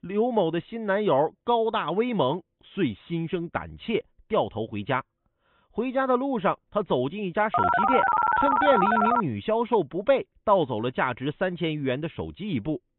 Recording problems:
high frequencies cut off; severe; nothing above 3.5 kHz
phone ringing; loud; from 7.5 to 9 s; peak 5 dB above the speech

